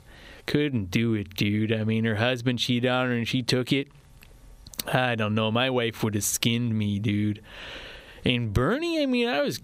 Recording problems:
squashed, flat; heavily

